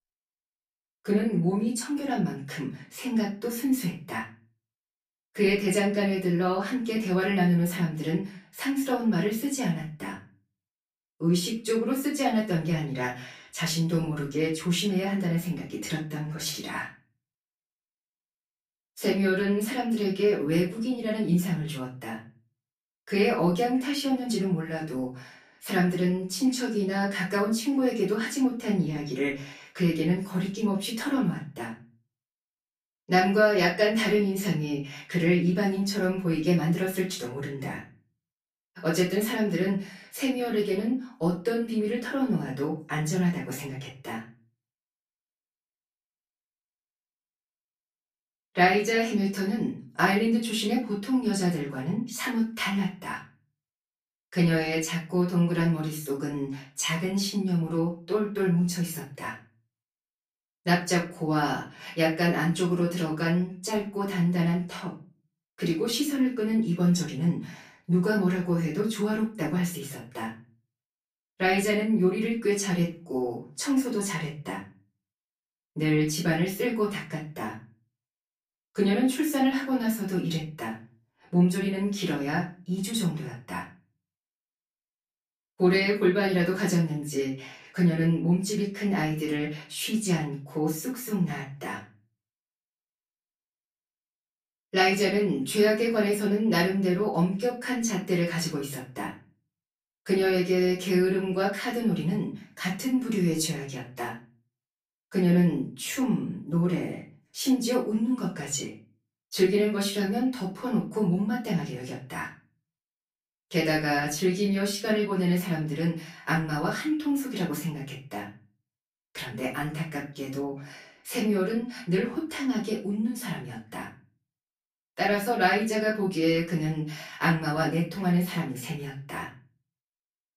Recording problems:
off-mic speech; far
room echo; slight; dies away in 0.3 s

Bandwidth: 15 kHz